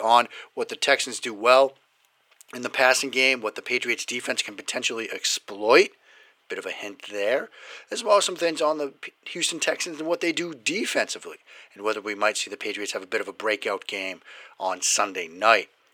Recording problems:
thin; very; fading below 450 Hz
abrupt cut into speech; at the start

